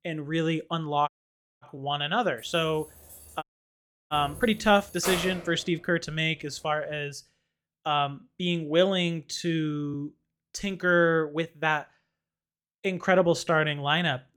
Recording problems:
uneven, jittery; strongly; from 0.5 to 14 s
audio cutting out; at 1 s for 0.5 s and at 3.5 s for 0.5 s
jangling keys; noticeable; from 2.5 to 5.5 s; peak 4 dB below the speech

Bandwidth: 18 kHz